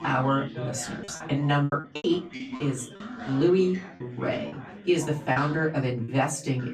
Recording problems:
off-mic speech; far
room echo; very slight; dies away in 0.2 s
background chatter; noticeable; throughout; 3 voices, 15 dB below the speech
choppy; very; 7% of the speech affected

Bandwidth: 14 kHz